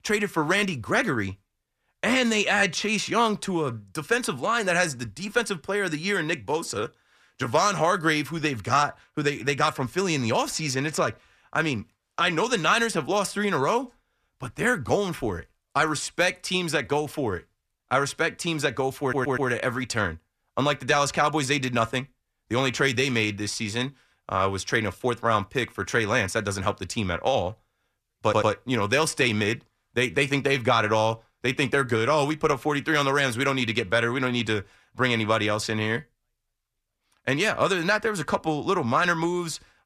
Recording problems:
audio stuttering; at 19 s and at 28 s

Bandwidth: 14.5 kHz